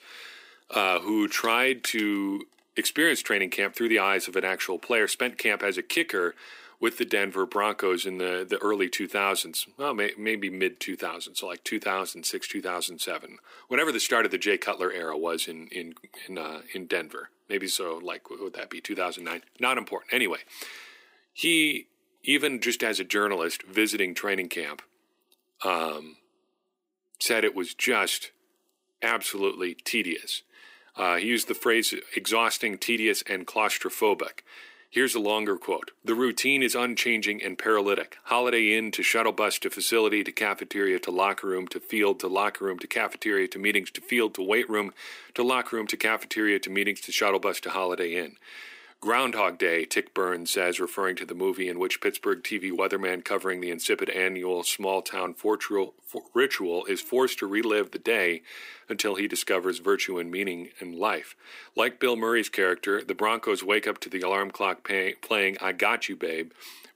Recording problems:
thin; somewhat; fading below 300 Hz

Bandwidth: 15.5 kHz